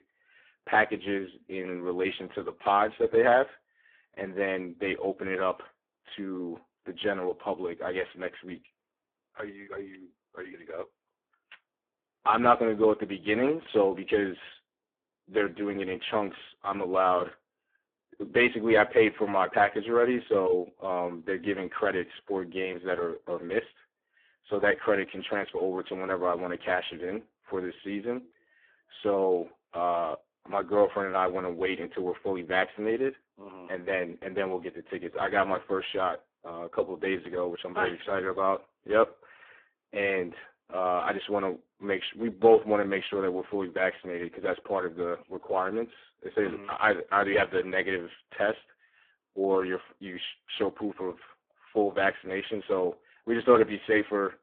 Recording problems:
phone-call audio; poor line

